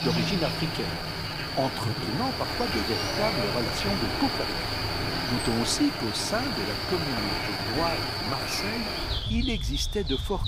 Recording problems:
animal sounds; very loud; throughout; 2 dB above the speech
uneven, jittery; strongly; from 0.5 to 9.5 s

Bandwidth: 15.5 kHz